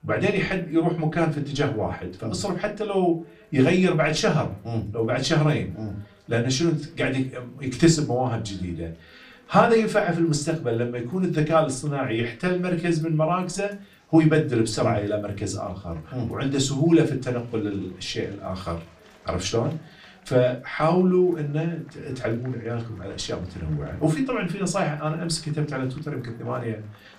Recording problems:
off-mic speech; far
room echo; very slight; dies away in 0.2 s
chatter from many people; faint; throughout; 30 dB below the speech

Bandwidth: 15 kHz